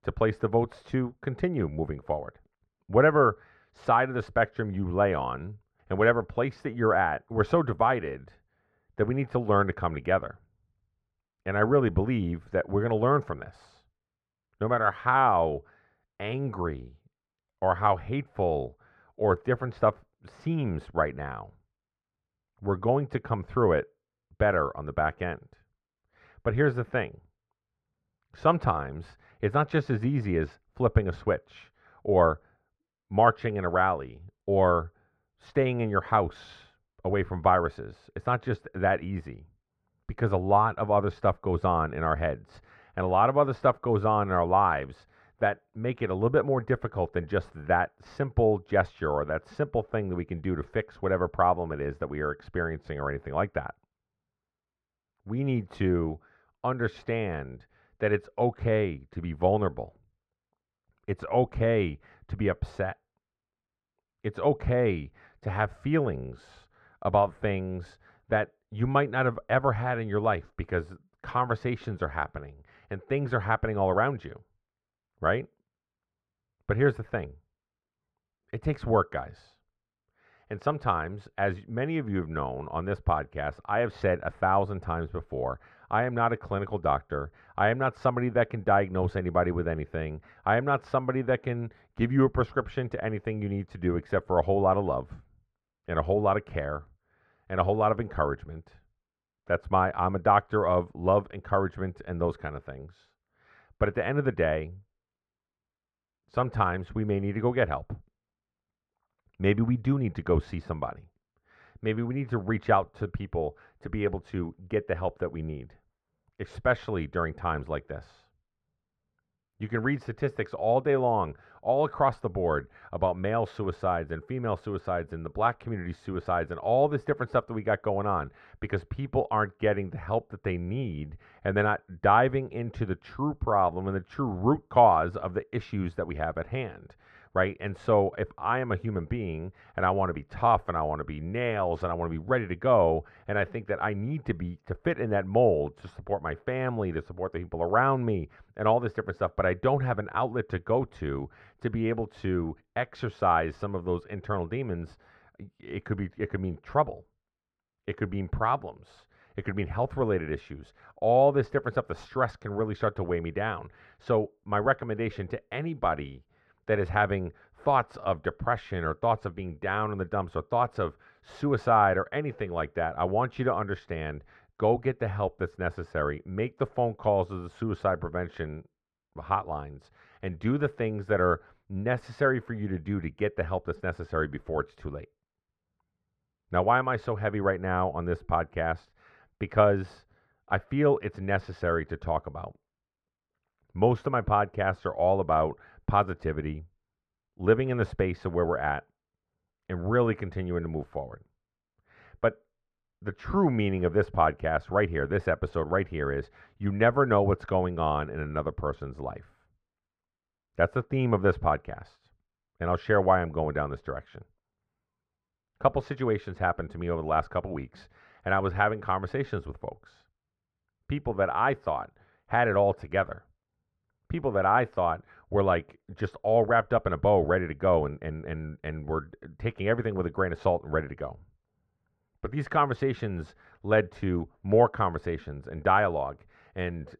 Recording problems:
muffled; very; fading above 4 kHz

